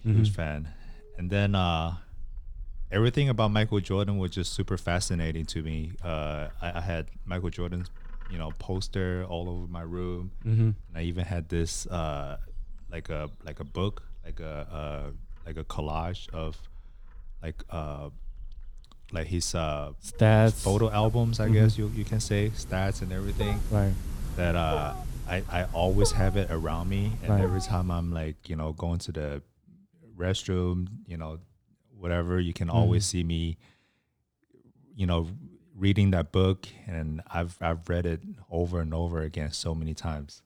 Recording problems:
animal sounds; noticeable; until 28 s; 10 dB below the speech

